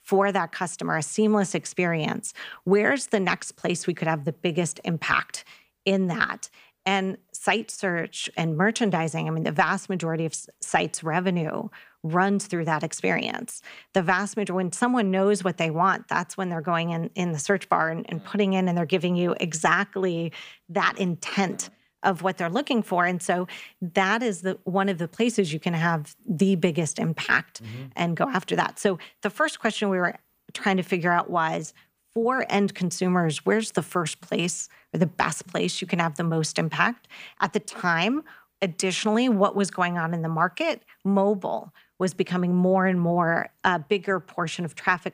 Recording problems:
none

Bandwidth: 15 kHz